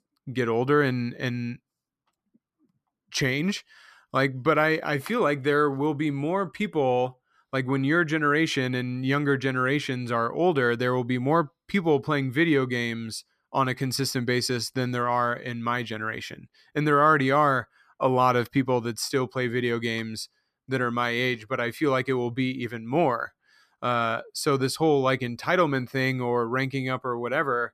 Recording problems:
none

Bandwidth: 14.5 kHz